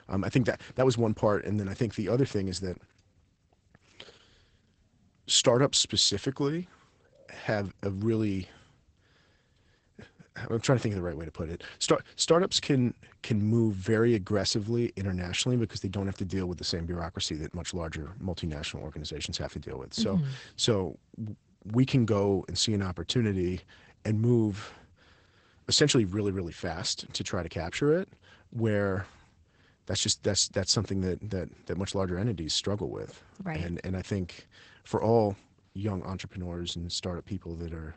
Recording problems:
garbled, watery; badly; nothing above 8 kHz

